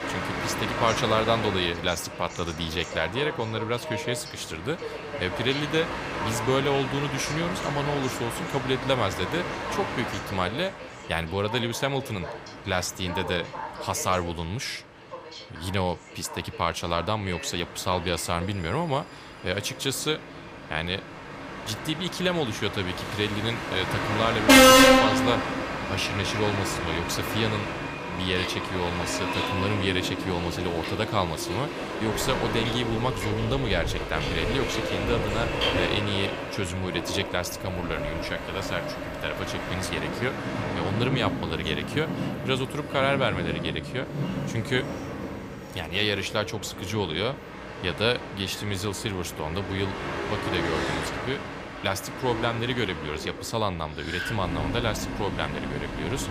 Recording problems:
train or aircraft noise; very loud; throughout; as loud as the speech

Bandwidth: 15 kHz